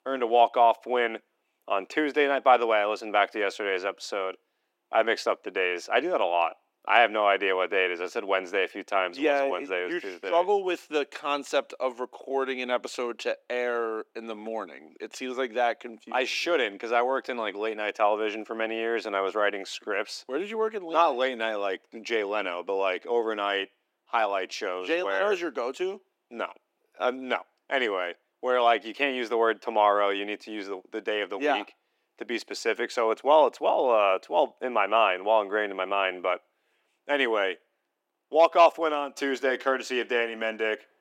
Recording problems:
thin; somewhat; fading below 300 Hz

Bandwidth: 16 kHz